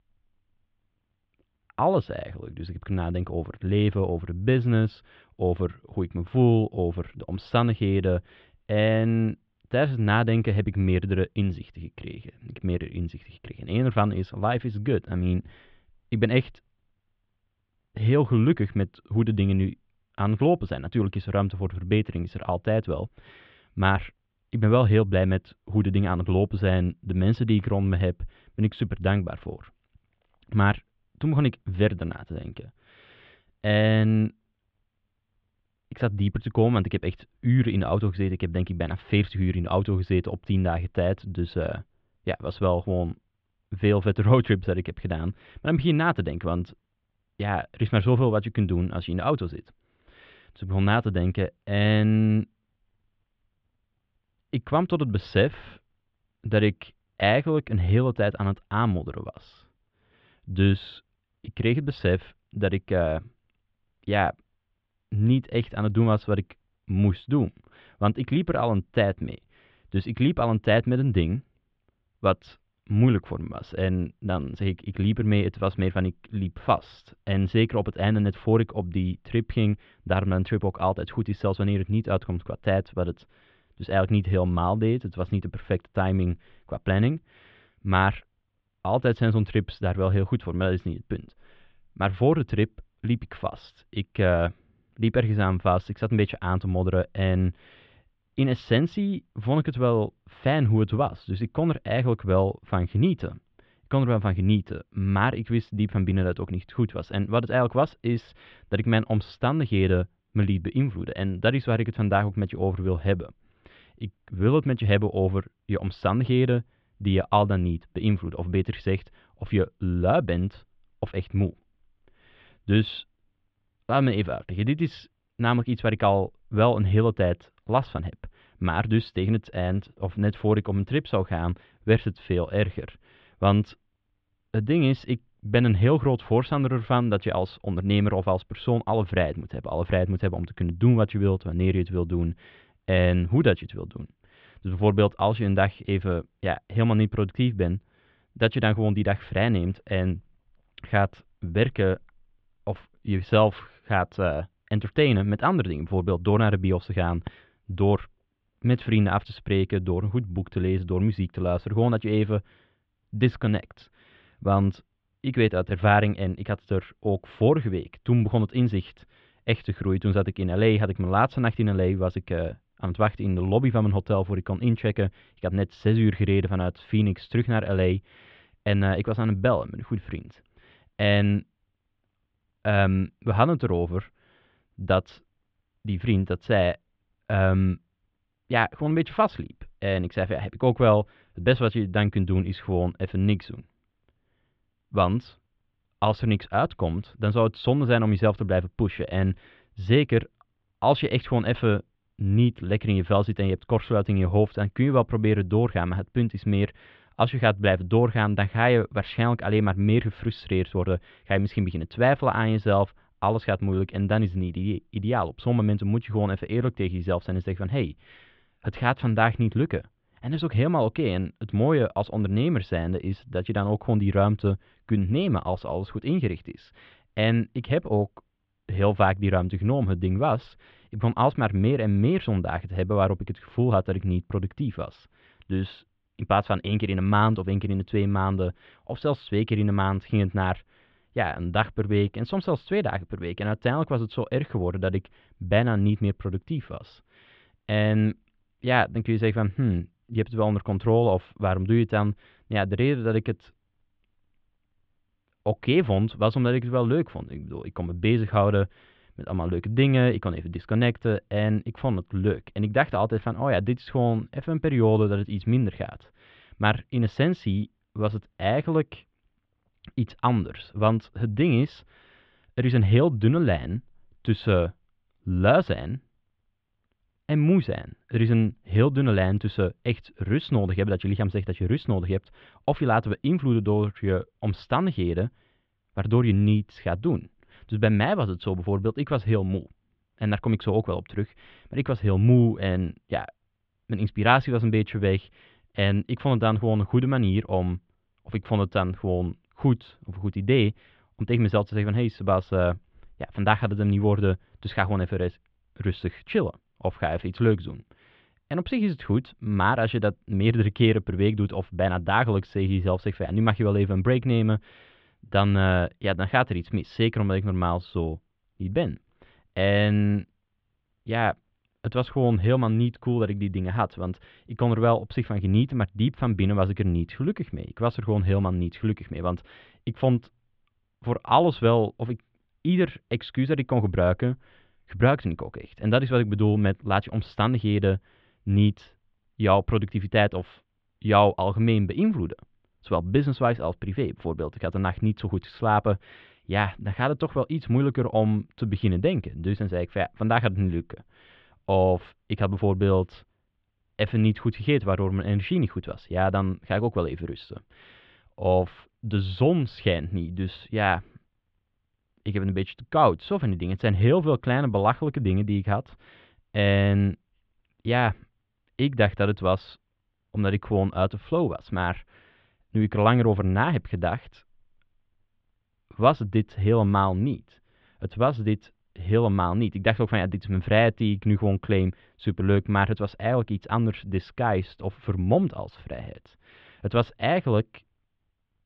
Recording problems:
muffled; very; fading above 3.5 kHz

